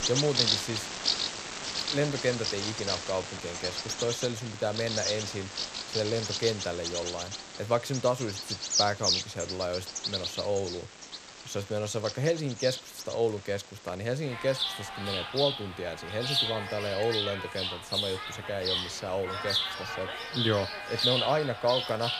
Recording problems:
animal sounds; very loud; throughout; 1 dB above the speech

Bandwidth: 14.5 kHz